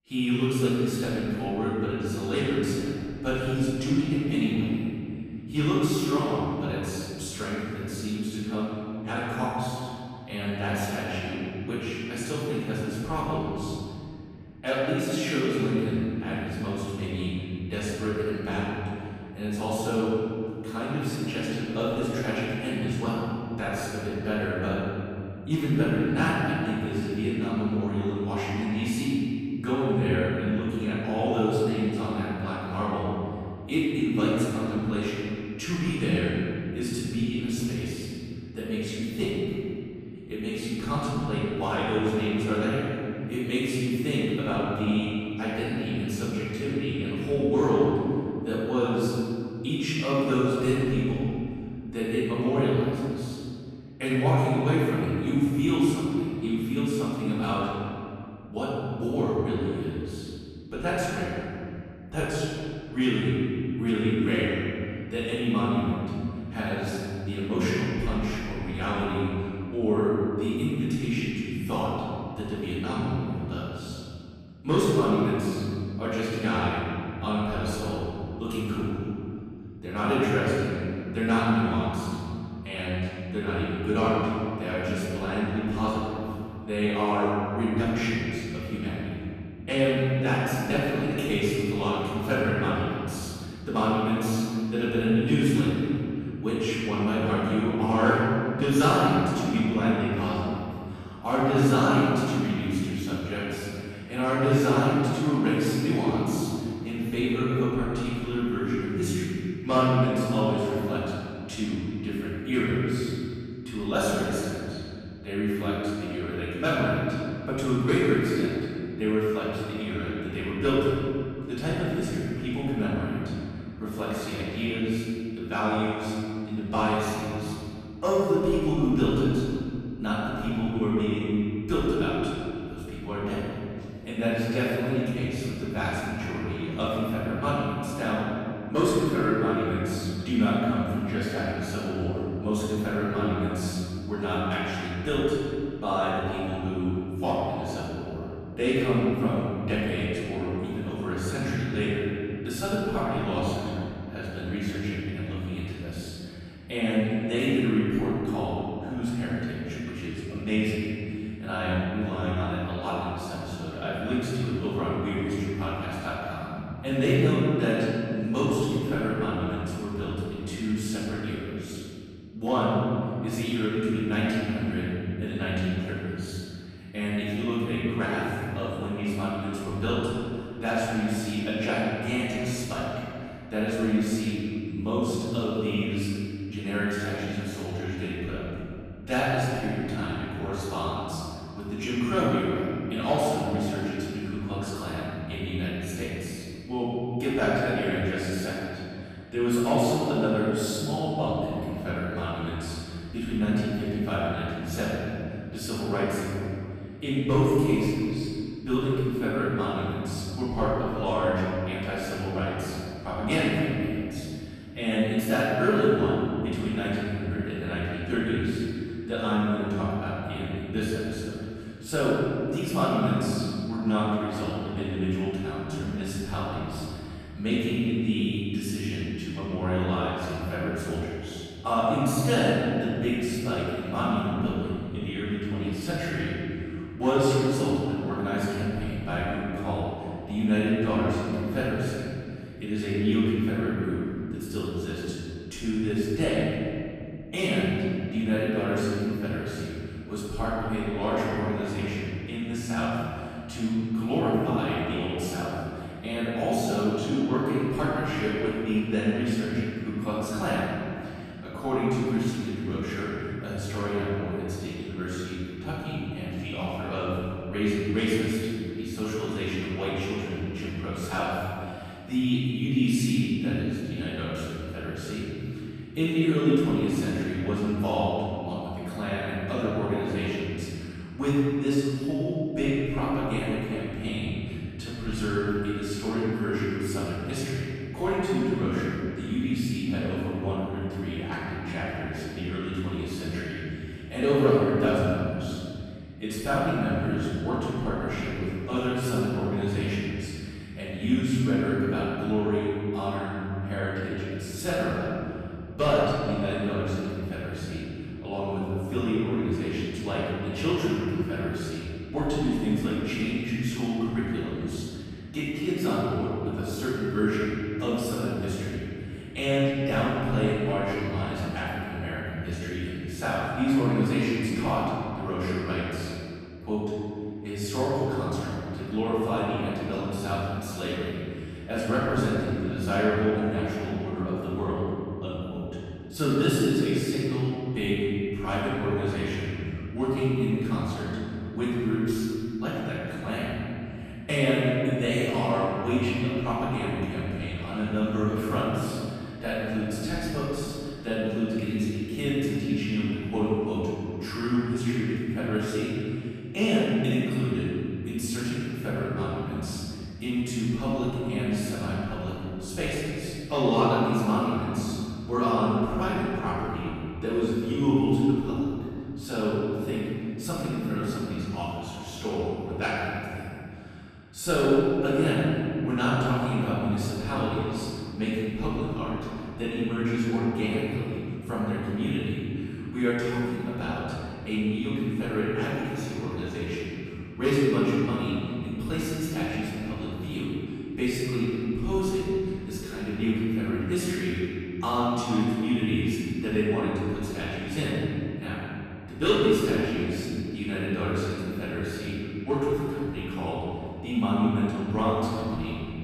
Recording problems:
room echo; strong; dies away in 2.6 s
off-mic speech; far

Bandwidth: 14.5 kHz